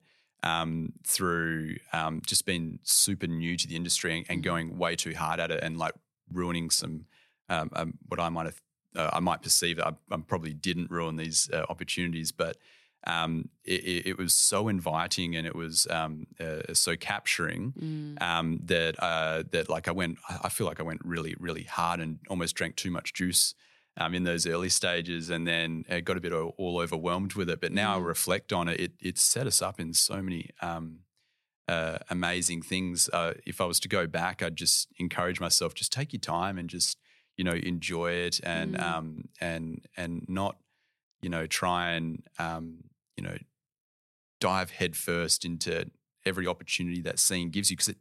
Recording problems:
none

